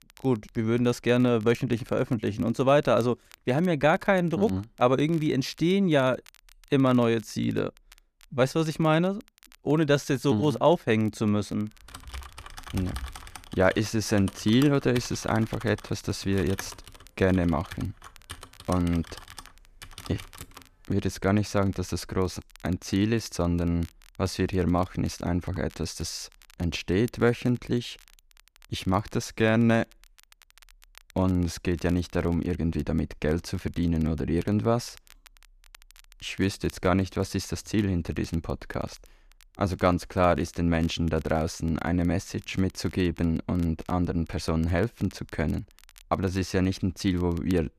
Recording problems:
crackle, like an old record; faint; 30 dB below the speech
keyboard typing; faint; from 12 to 21 s; peak 10 dB below the speech

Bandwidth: 14.5 kHz